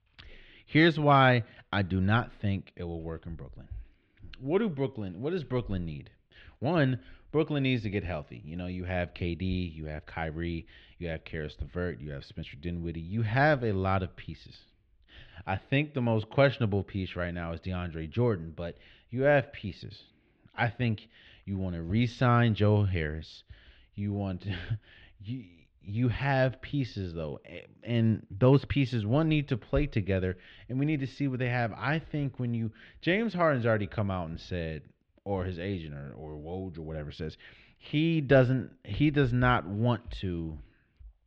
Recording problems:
muffled; slightly; fading above 3 kHz

